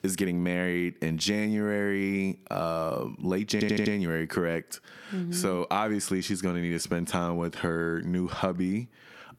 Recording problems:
squashed, flat; somewhat
audio stuttering; at 3.5 s

